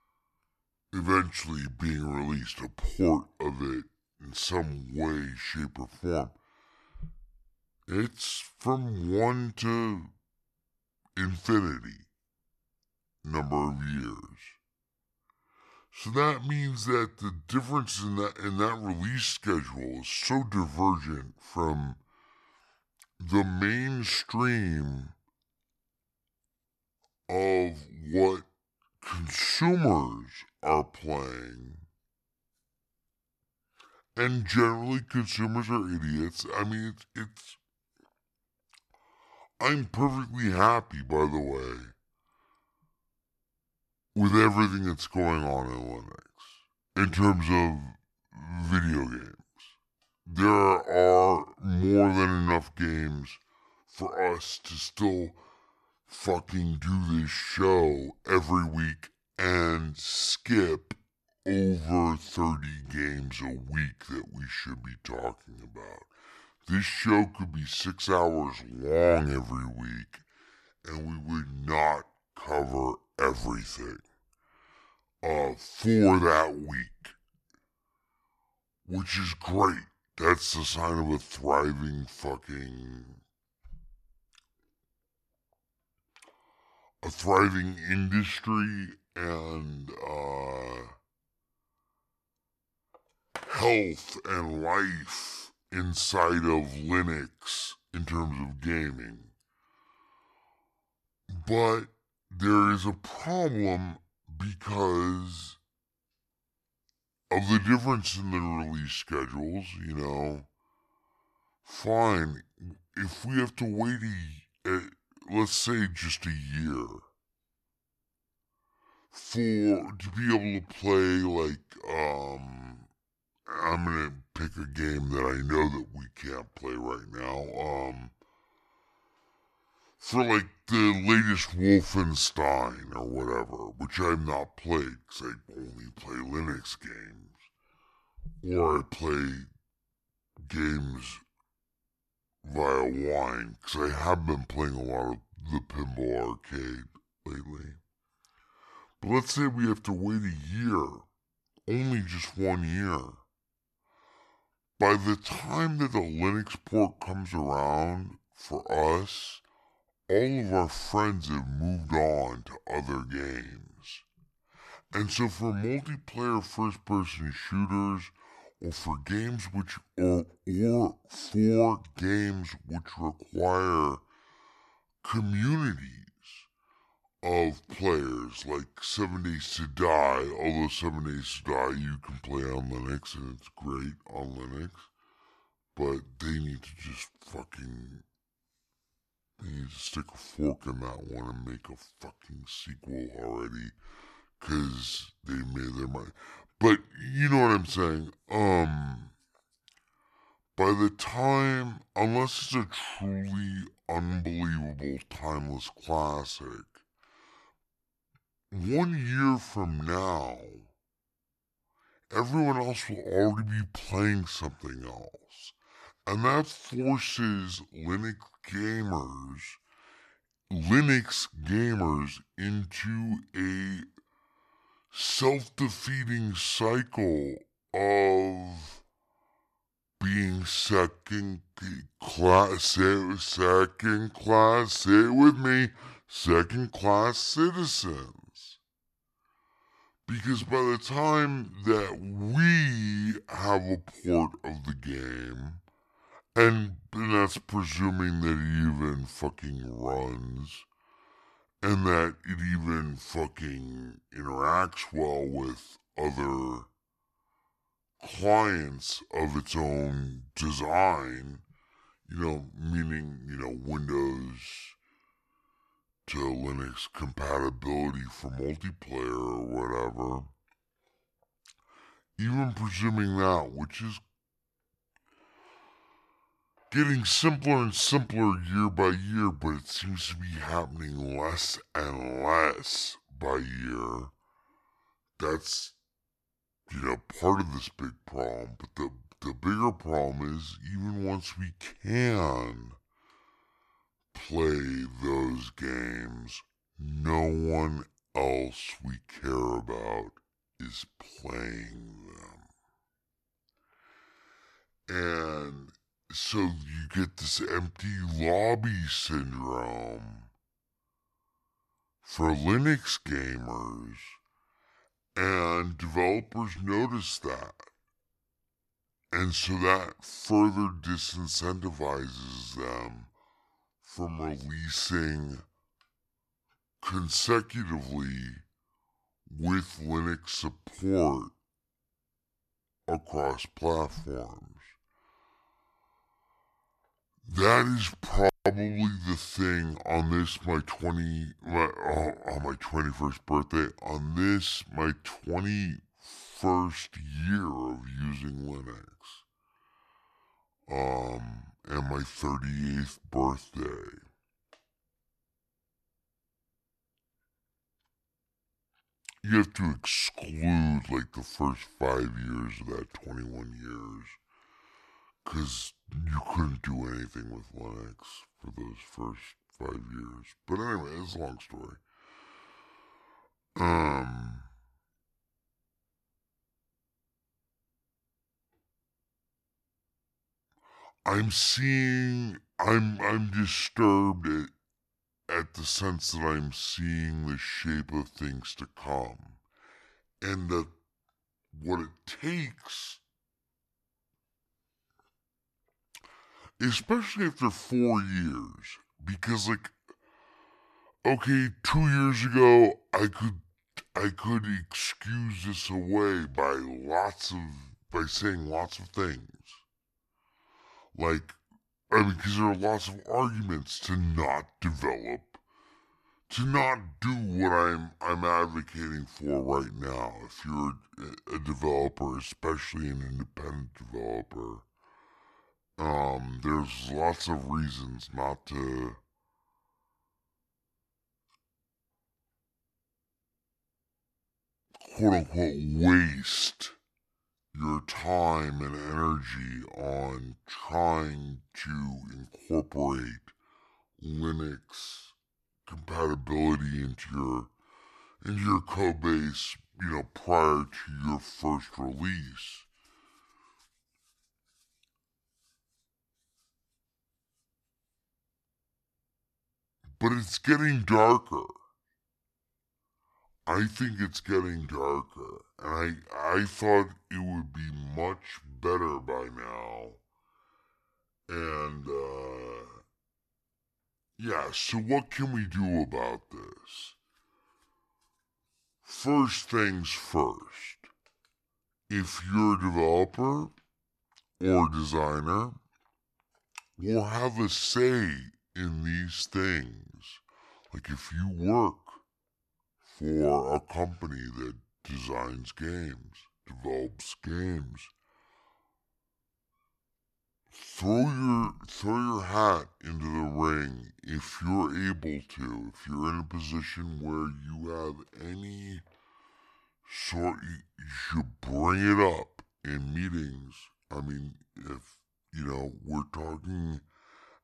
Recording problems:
wrong speed and pitch; too slow and too low; 0.7 times normal speed

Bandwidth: 13 kHz